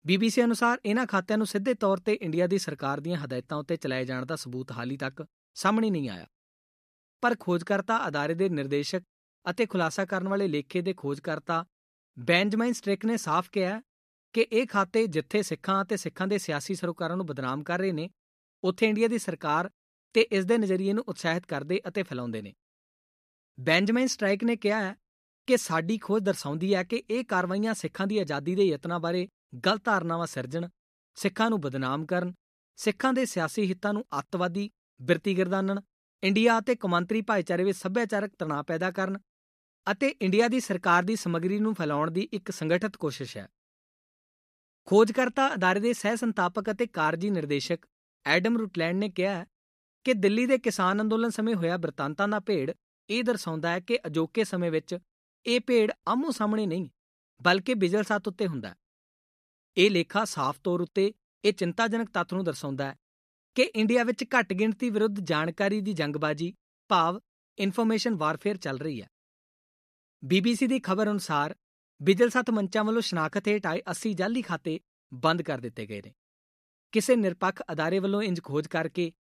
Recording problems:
none

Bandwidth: 14.5 kHz